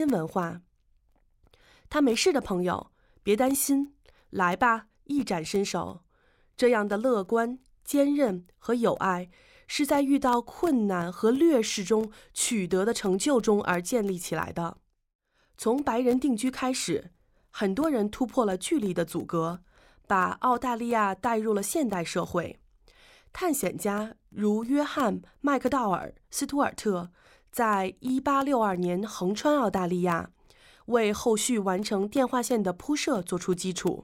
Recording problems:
abrupt cut into speech; at the start

